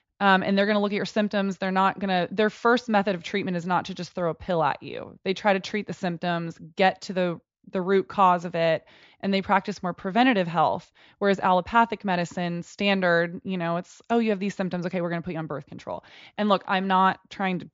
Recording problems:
high frequencies cut off; noticeable; nothing above 7.5 kHz

